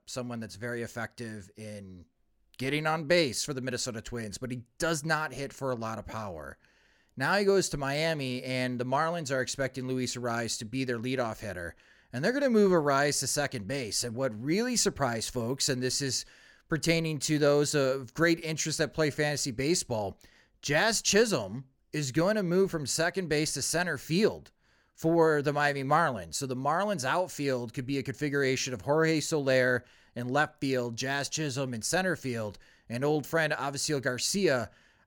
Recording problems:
none

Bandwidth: 18 kHz